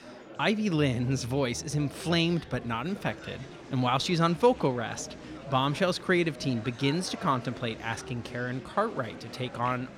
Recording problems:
murmuring crowd; noticeable; throughout; 15 dB below the speech

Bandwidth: 16.5 kHz